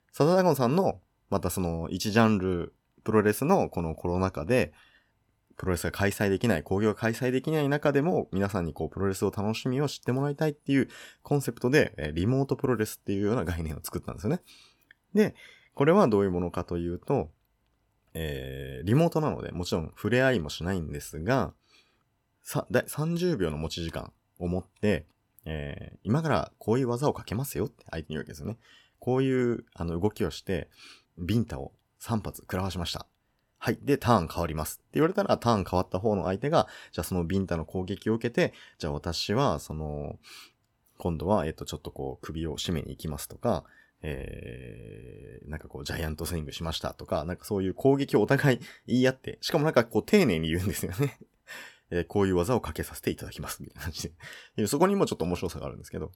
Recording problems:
none

